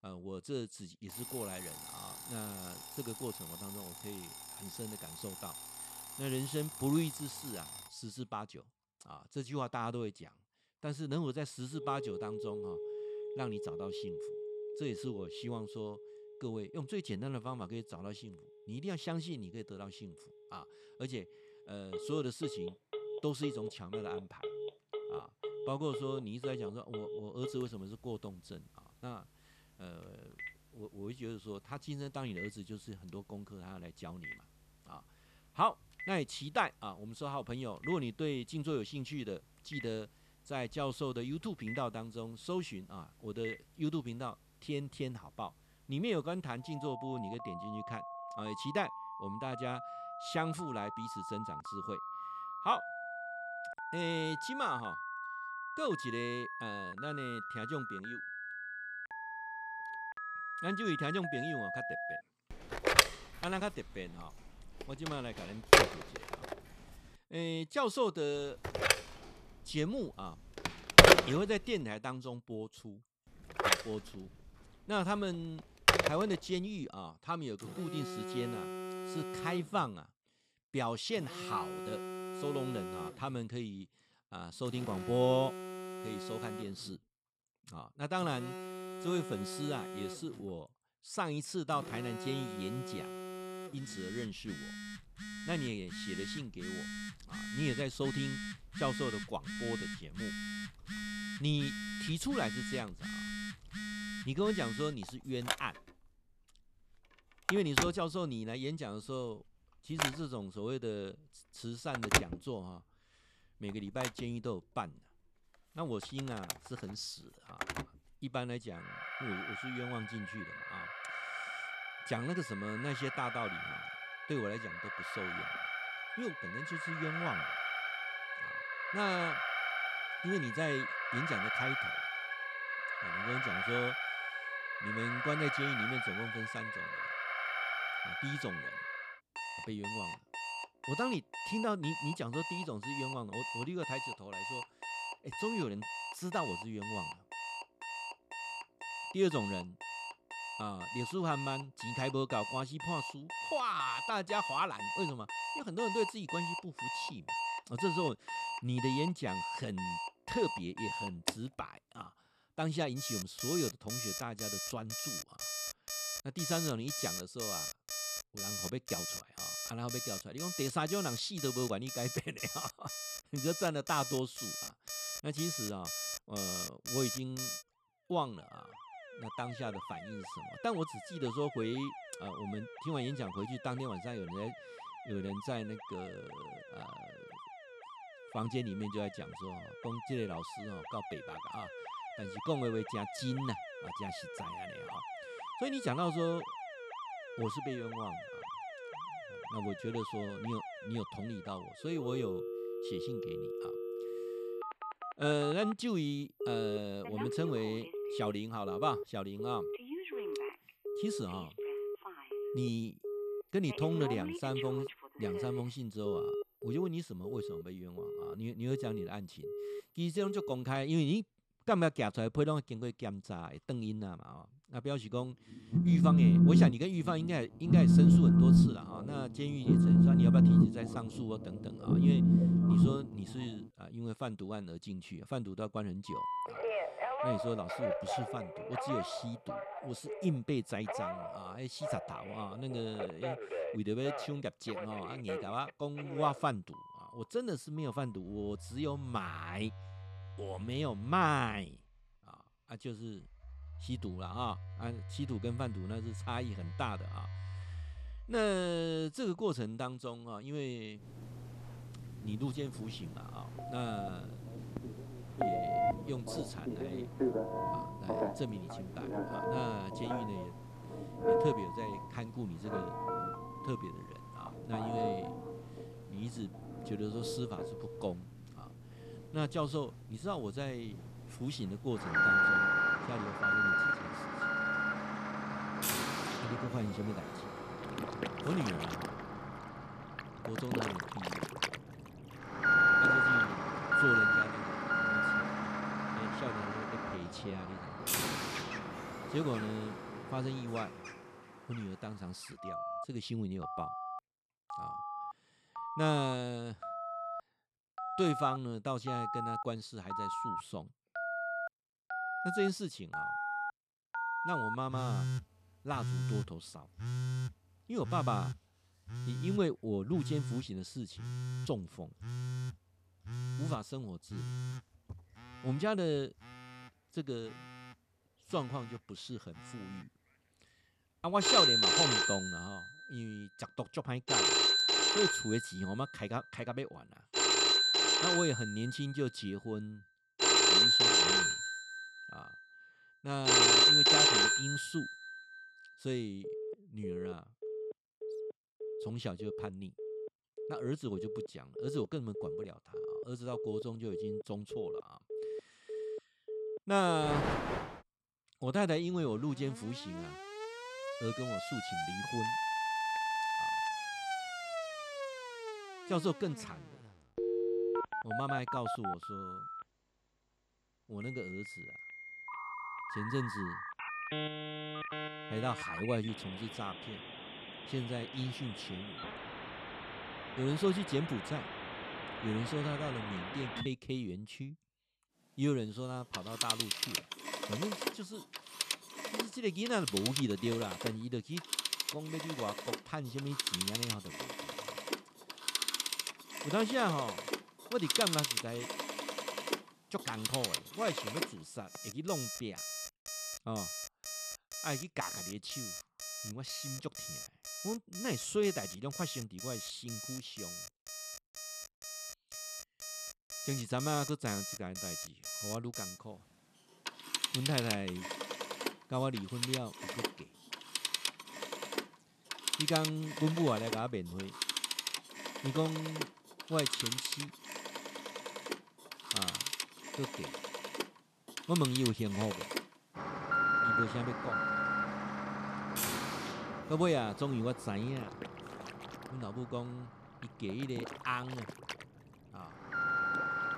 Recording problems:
alarms or sirens; very loud; throughout; 4 dB above the speech

